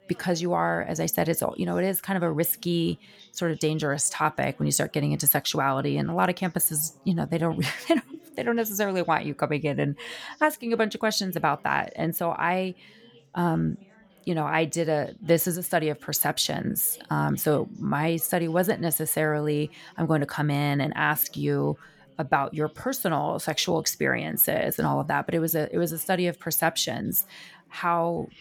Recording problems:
background chatter; faint; throughout; 4 voices, 30 dB below the speech

